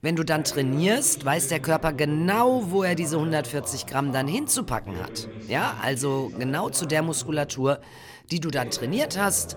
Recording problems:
voice in the background; noticeable; throughout; 15 dB below the speech

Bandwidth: 17.5 kHz